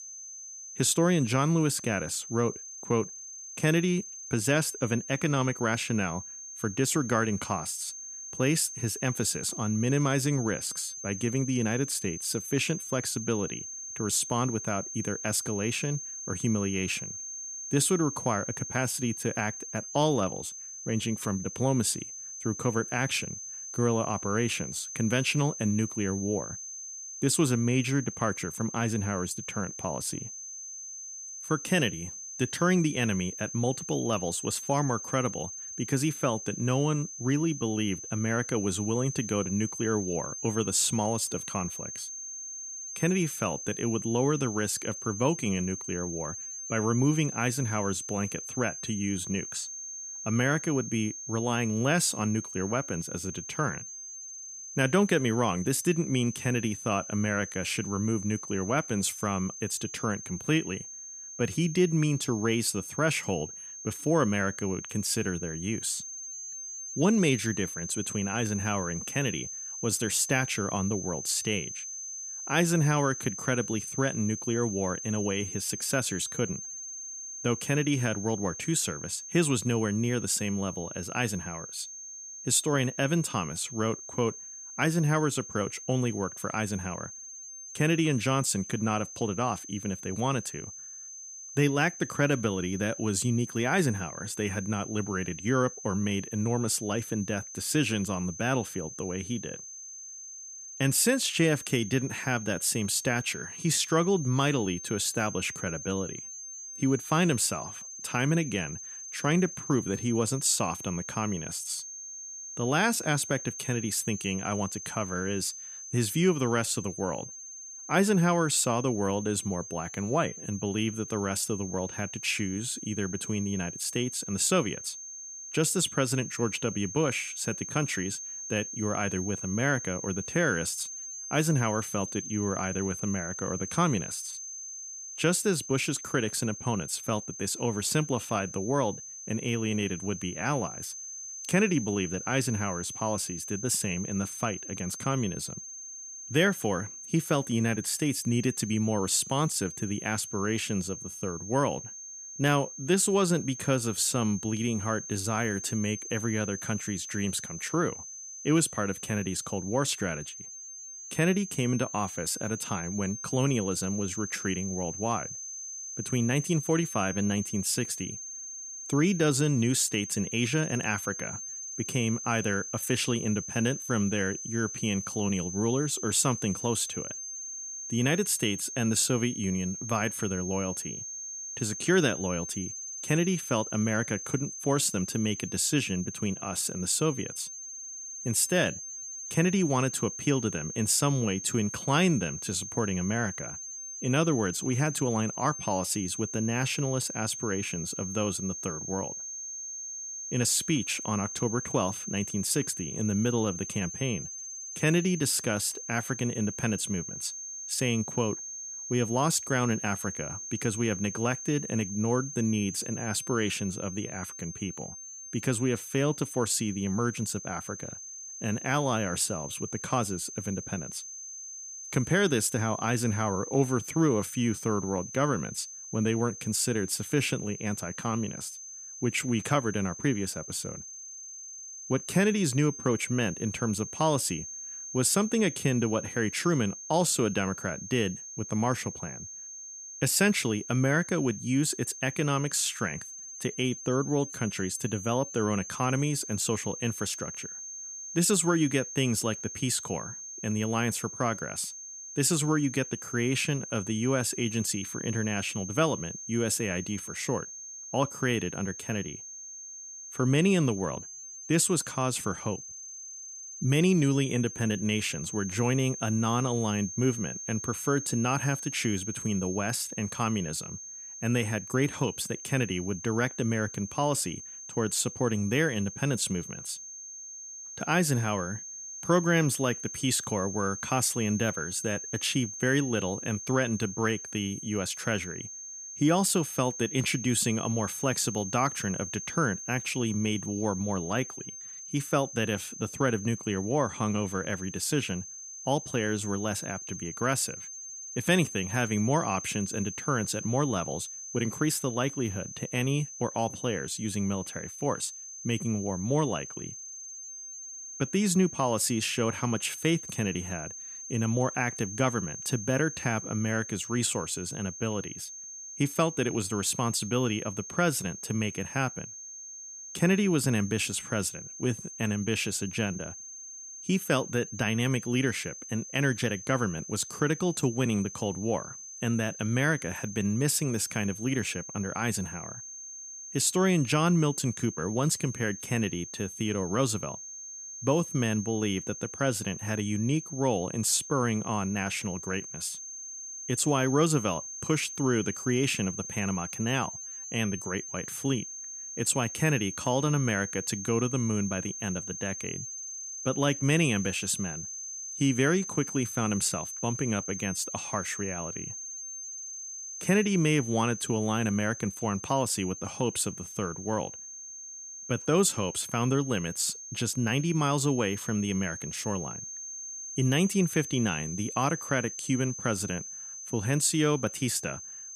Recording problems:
high-pitched whine; loud; throughout; 6.5 kHz, 9 dB below the speech

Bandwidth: 14.5 kHz